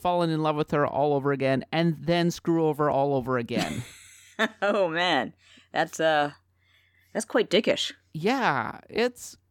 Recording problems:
none

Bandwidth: 17 kHz